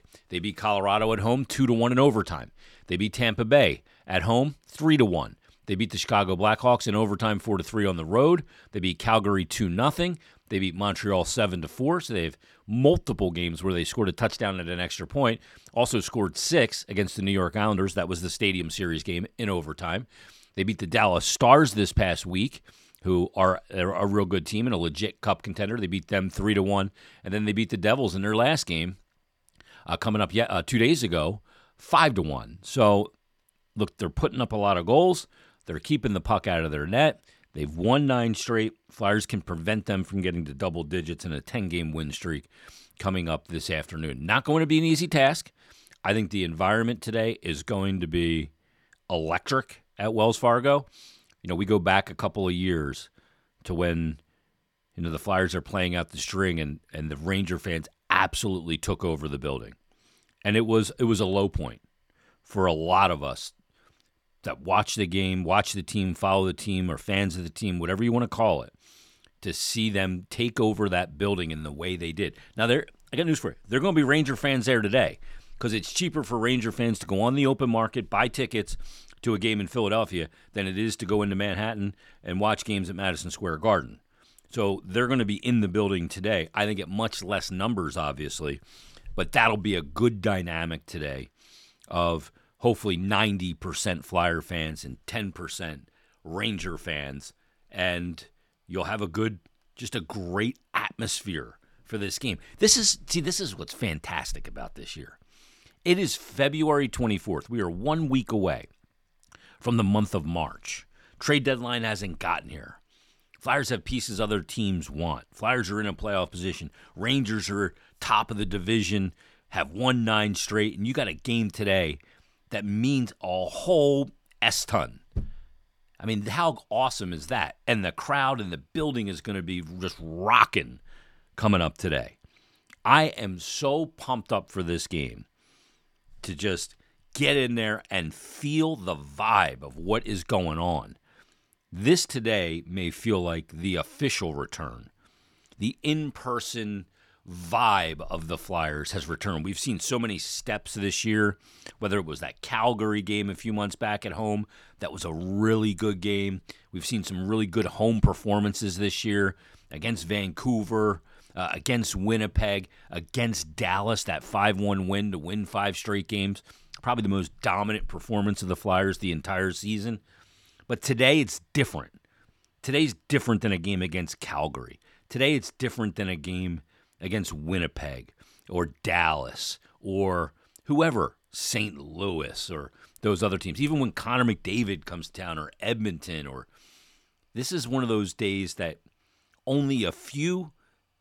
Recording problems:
none

